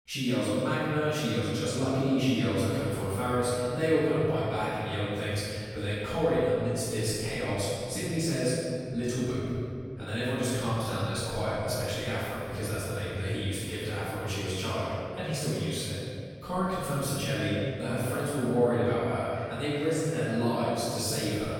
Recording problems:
room echo; strong; dies away in 2.3 s
off-mic speech; far

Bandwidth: 17 kHz